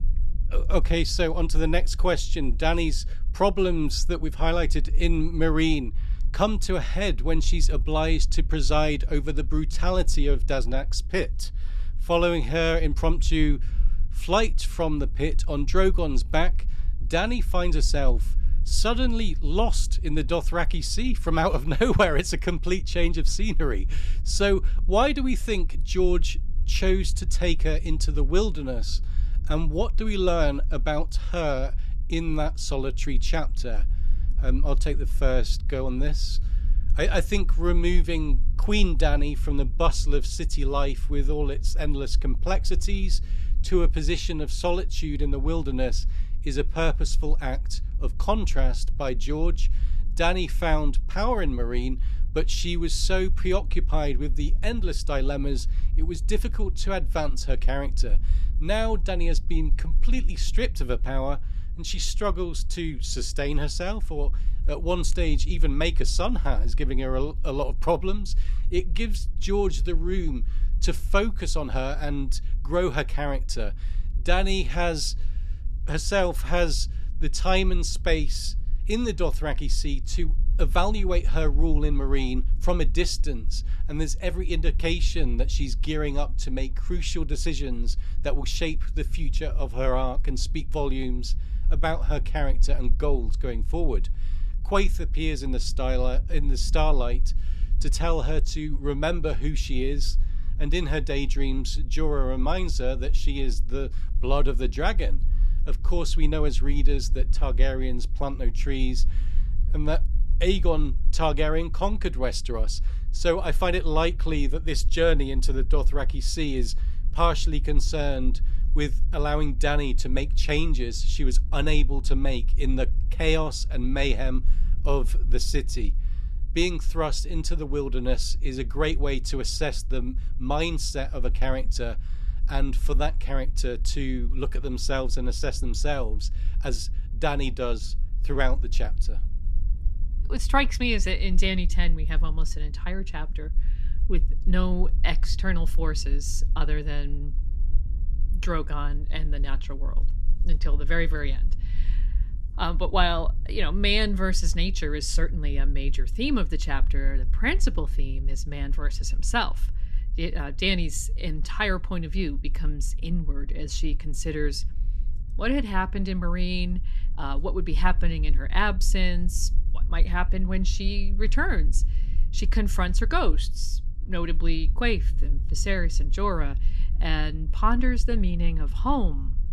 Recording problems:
low rumble; faint; throughout; 25 dB below the speech

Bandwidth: 13.5 kHz